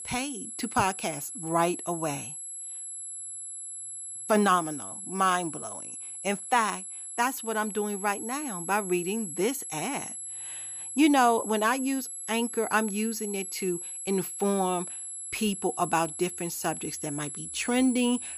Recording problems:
high-pitched whine; loud; throughout; 11 kHz, 7 dB below the speech

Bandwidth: 13.5 kHz